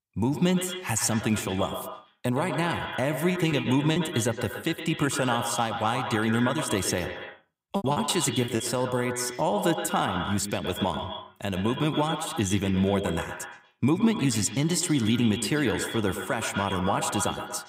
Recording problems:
echo of what is said; strong; throughout; 120 ms later, 7 dB below the speech
choppy; very; at 3.5 s and at 8 s; 21% of the speech affected

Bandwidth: 15.5 kHz